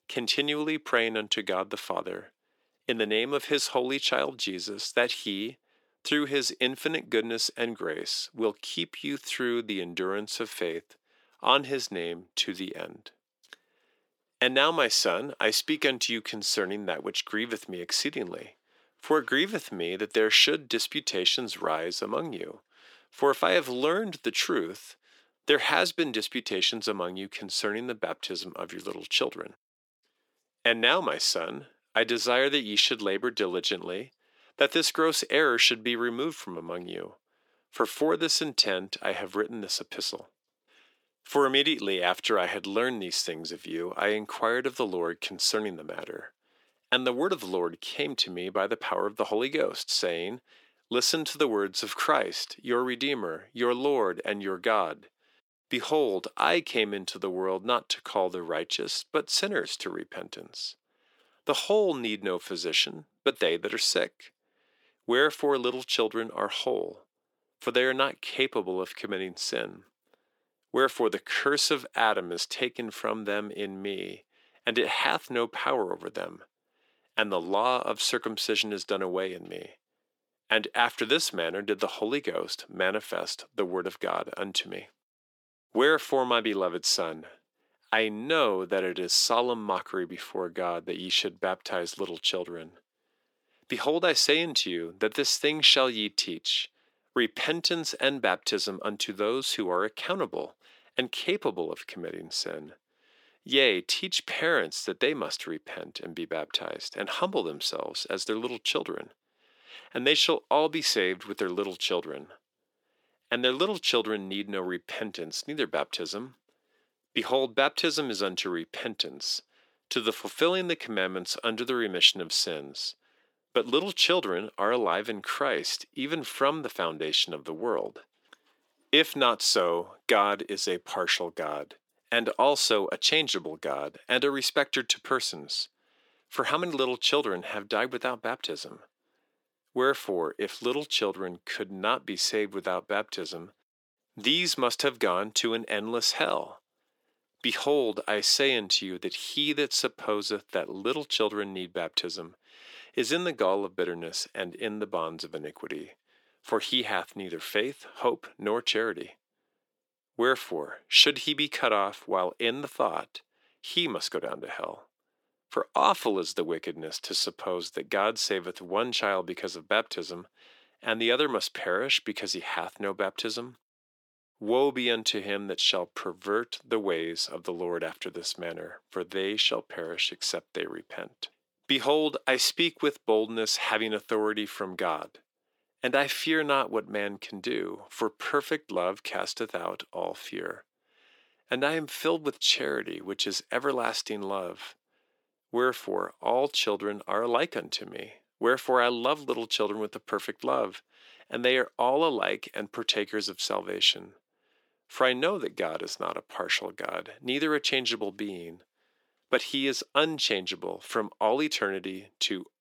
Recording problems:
thin; very; fading below 350 Hz

